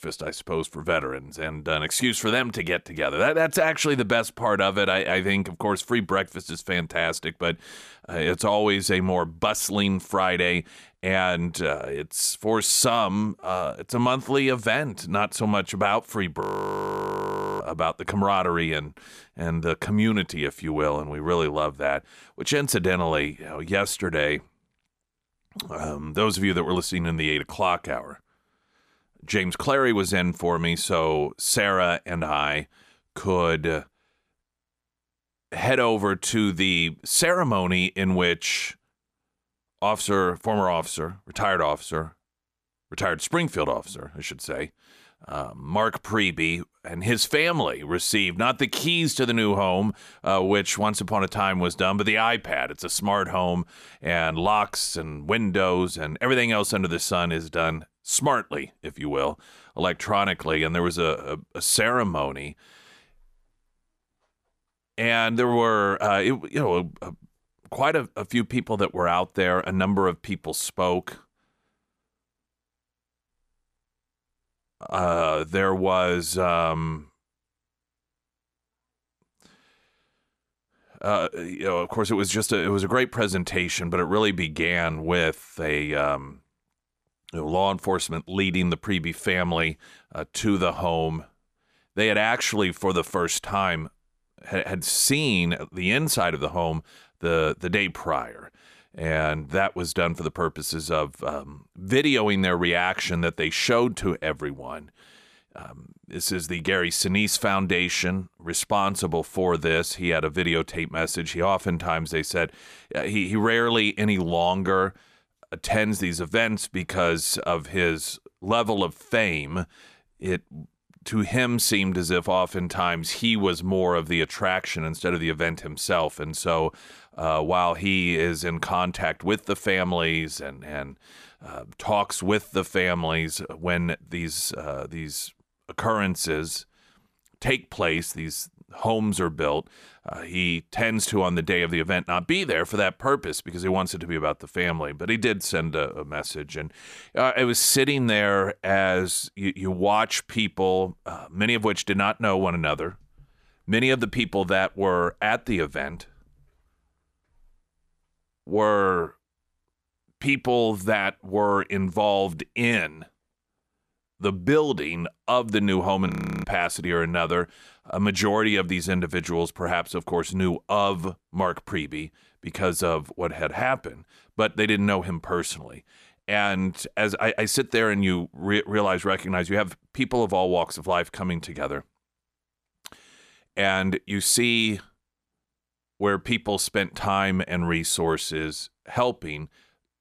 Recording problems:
audio freezing; at 16 s for 1 s and at 2:46

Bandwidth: 14.5 kHz